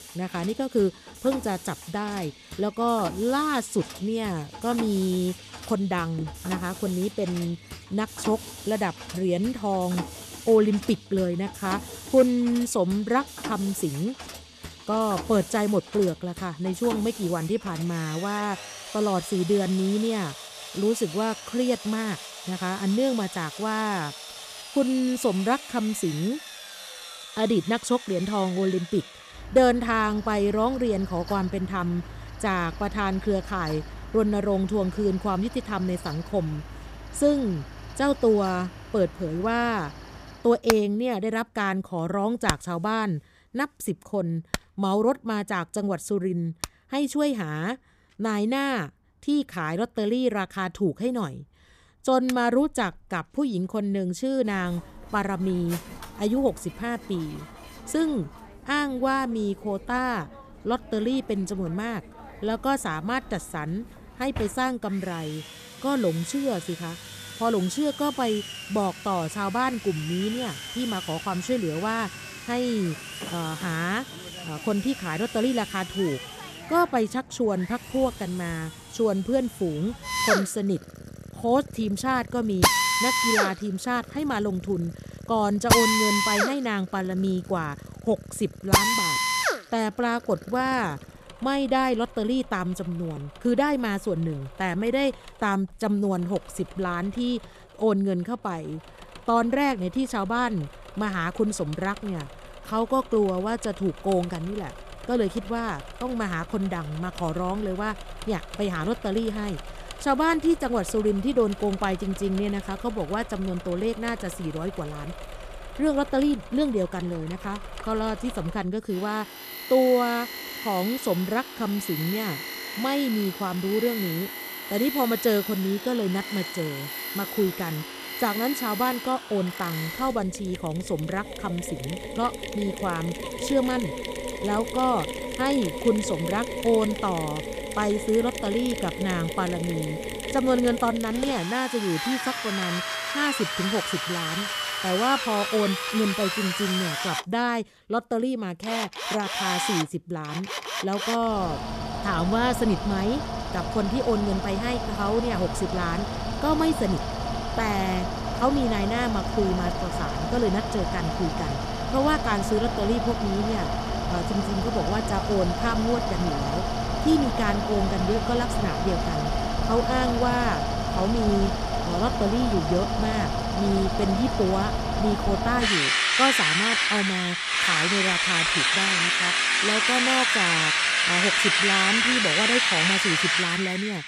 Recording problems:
machinery noise; loud; throughout; 1 dB below the speech

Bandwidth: 14.5 kHz